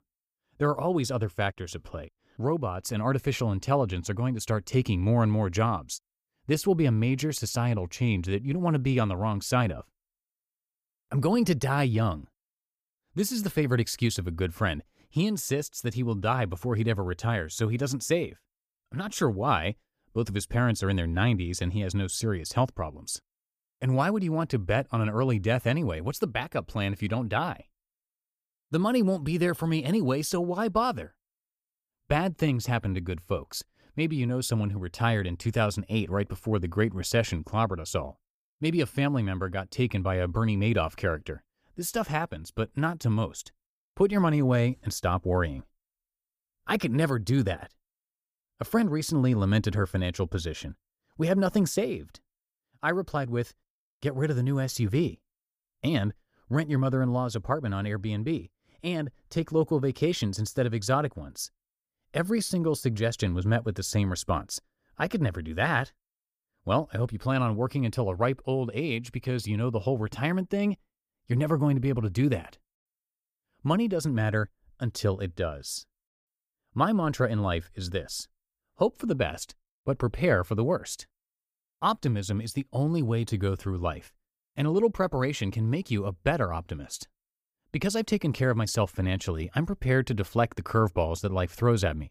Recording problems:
none

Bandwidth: 15 kHz